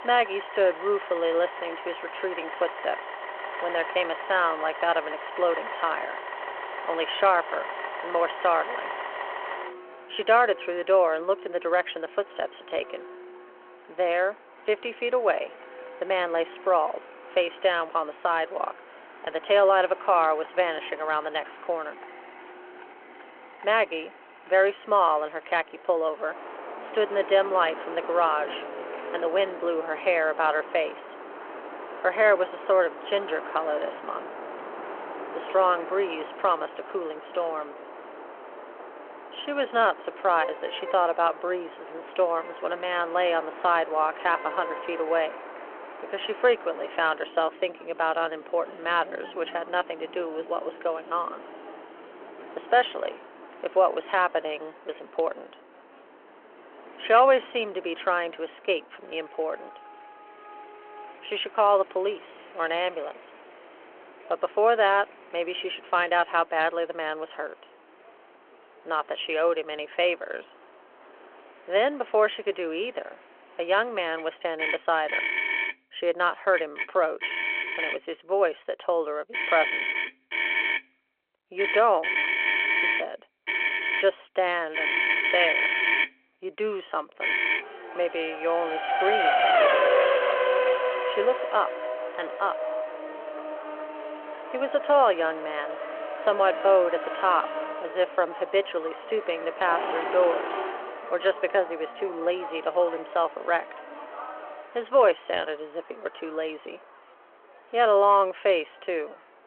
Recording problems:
phone-call audio
traffic noise; loud; throughout; 4 dB below the speech

